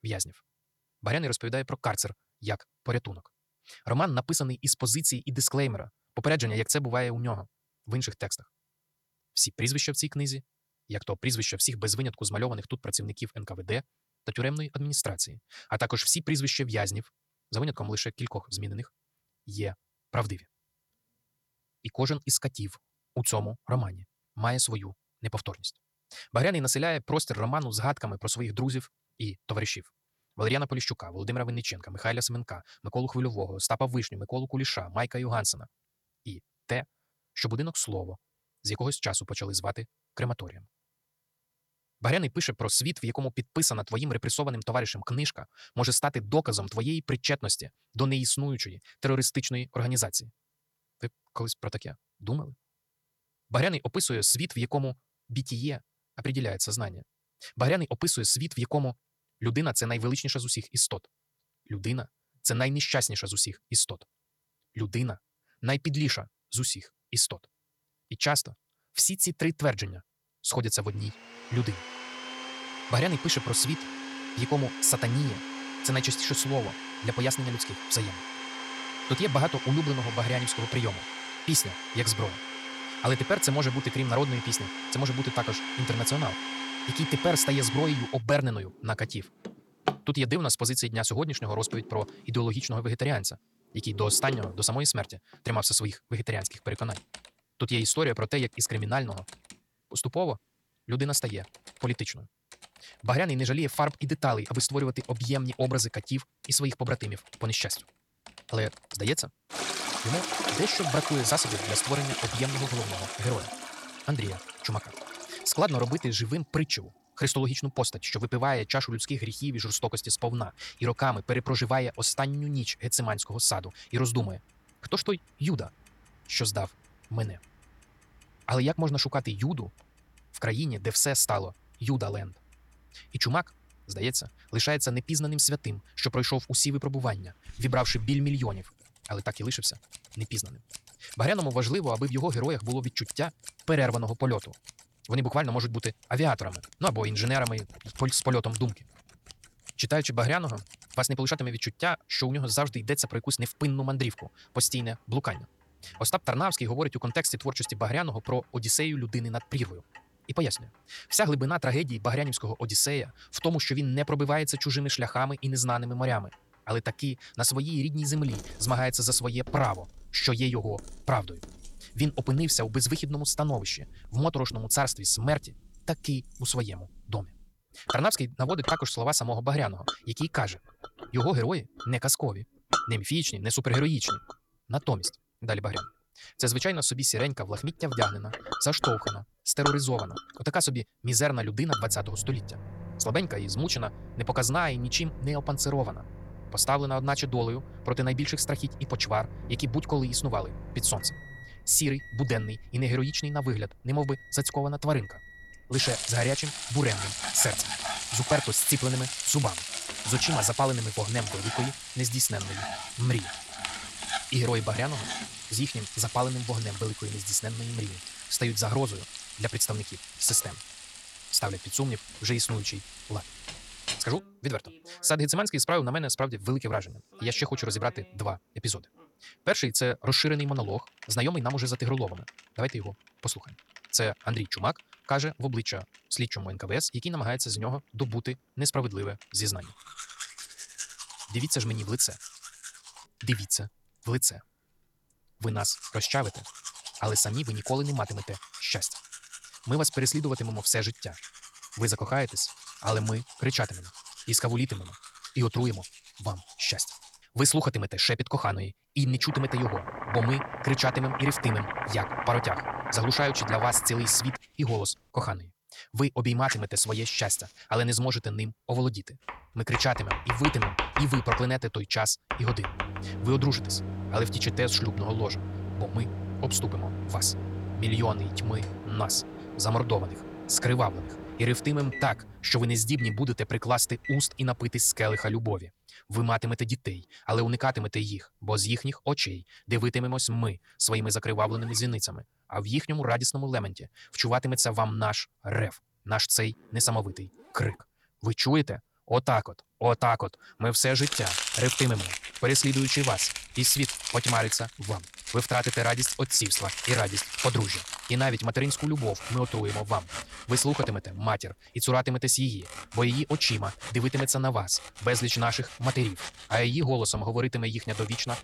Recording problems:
wrong speed, natural pitch; too fast; 1.6 times normal speed
household noises; loud; from 1:11 on; 8 dB below the speech

